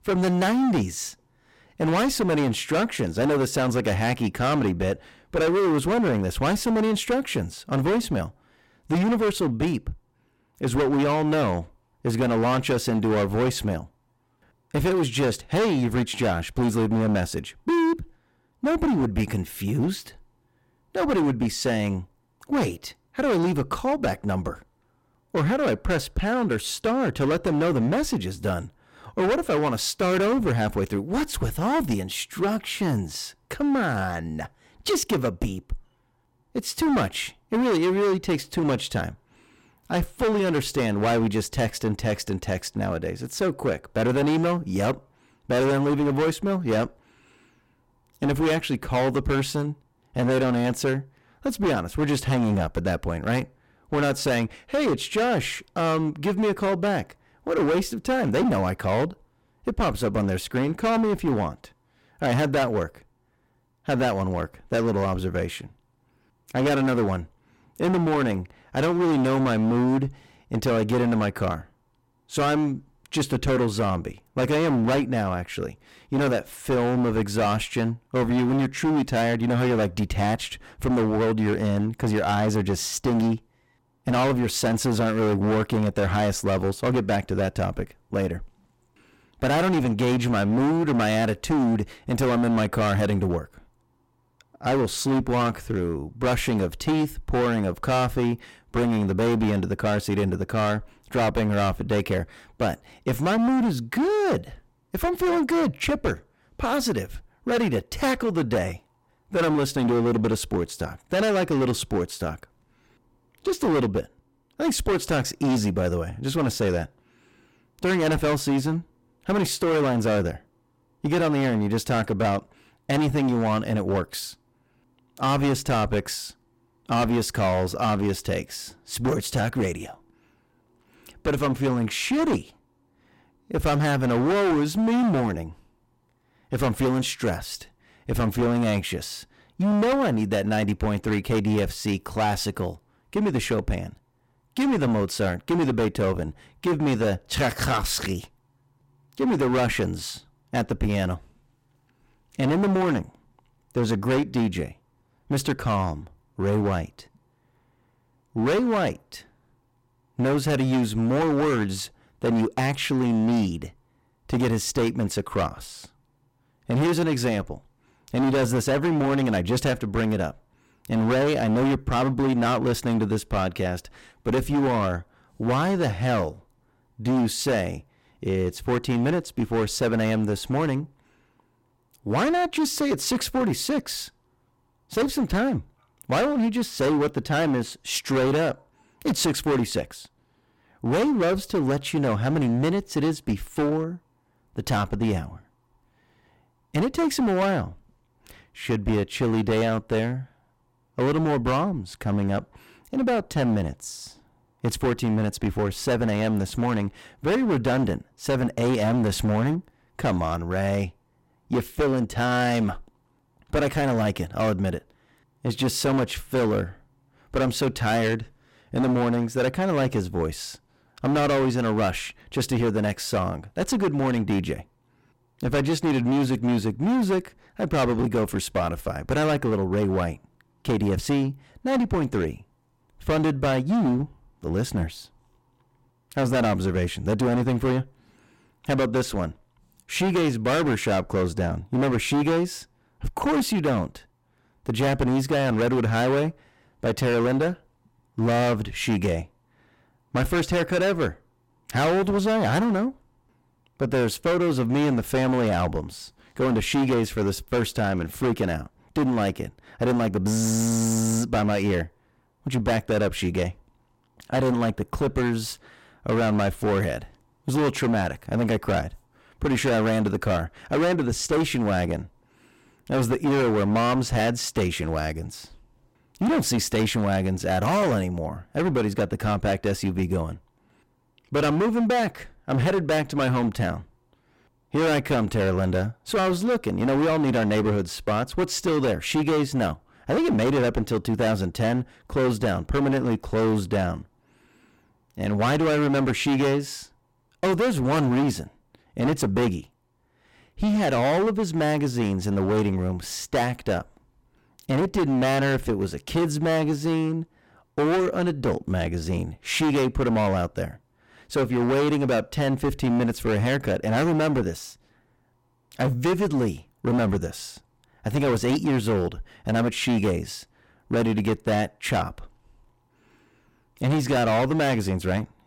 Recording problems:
distortion; heavy; 17% of the sound clipped

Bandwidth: 16.5 kHz